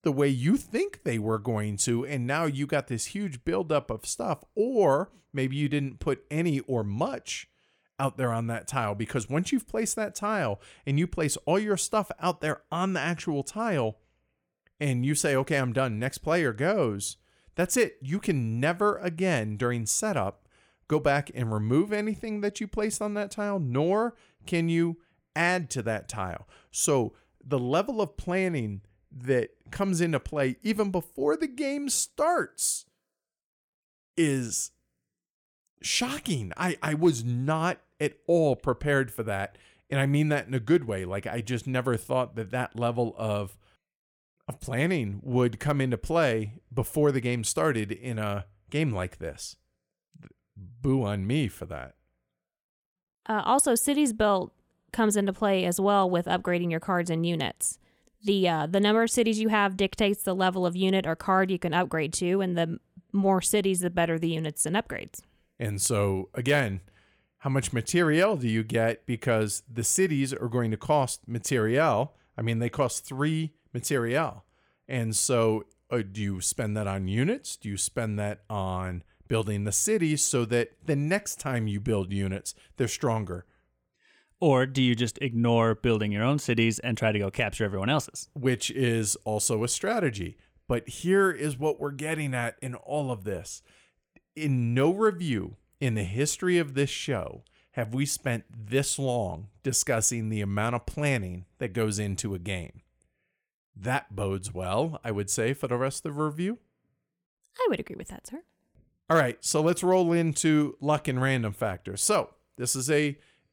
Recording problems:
none

